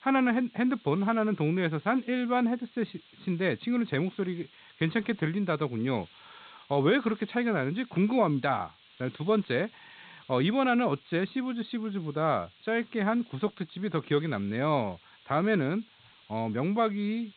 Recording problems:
high frequencies cut off; severe; nothing above 4 kHz
hiss; faint; throughout; 25 dB below the speech

